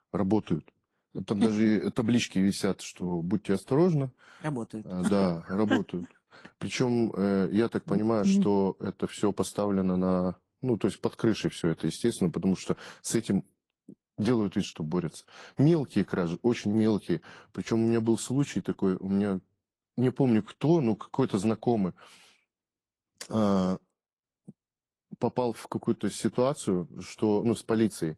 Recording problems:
garbled, watery; slightly; nothing above 11.5 kHz

